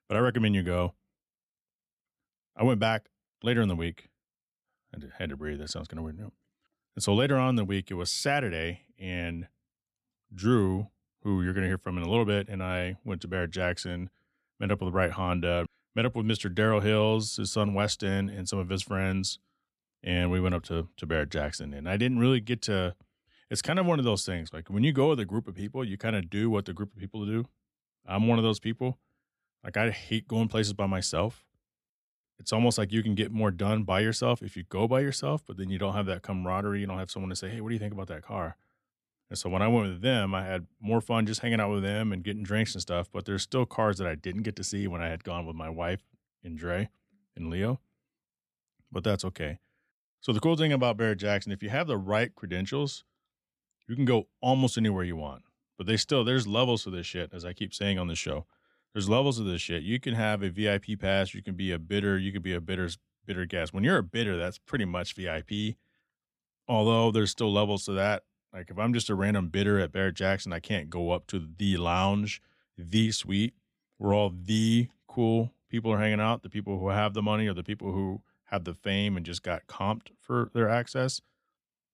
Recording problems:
none

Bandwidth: 14.5 kHz